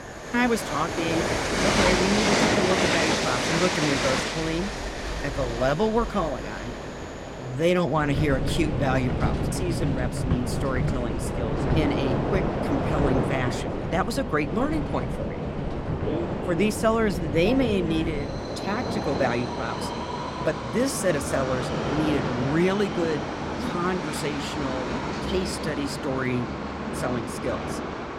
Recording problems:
train or aircraft noise; loud; throughout; as loud as the speech

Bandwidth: 16.5 kHz